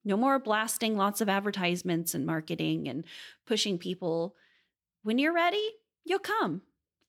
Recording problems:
none

